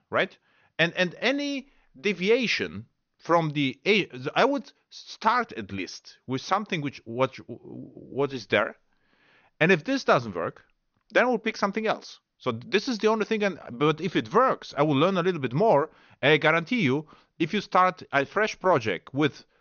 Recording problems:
high frequencies cut off; noticeable; nothing above 6.5 kHz

